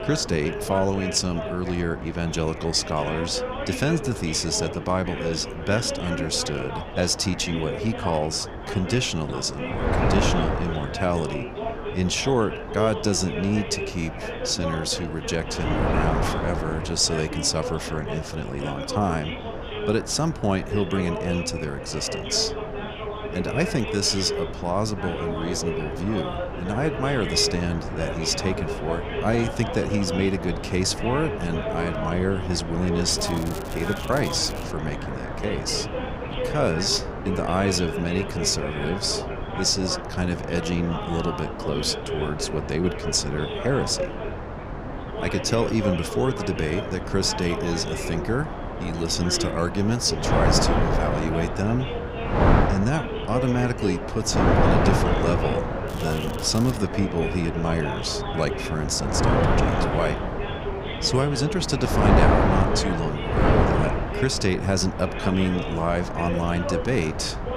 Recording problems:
wind noise on the microphone; heavy; 4 dB below the speech
background chatter; loud; throughout; 4 voices, 7 dB below the speech
crackling; noticeable; from 33 to 35 s and at 56 s; 15 dB below the speech

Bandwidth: 15.5 kHz